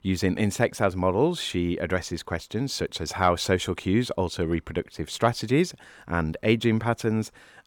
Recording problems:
none

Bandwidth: 18 kHz